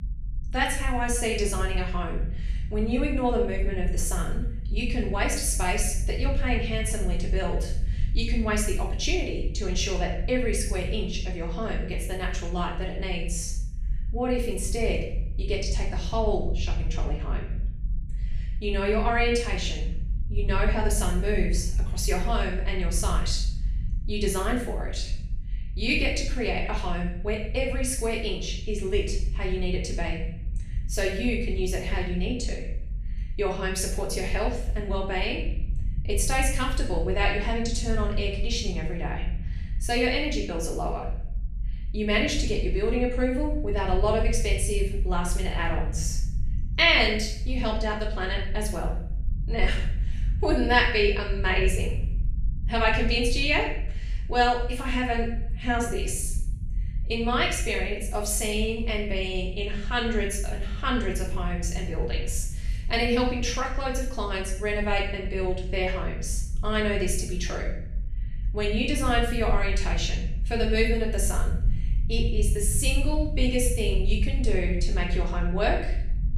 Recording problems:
off-mic speech; far
room echo; noticeable; dies away in 0.6 s
low rumble; faint; throughout; 20 dB below the speech

